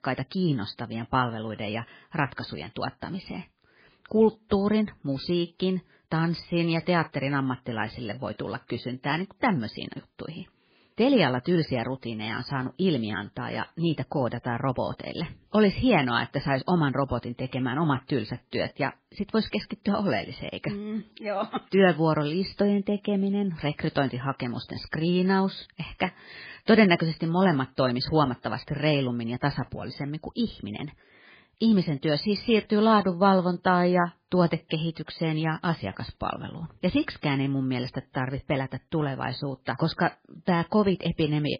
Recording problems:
garbled, watery; badly; nothing above 5 kHz

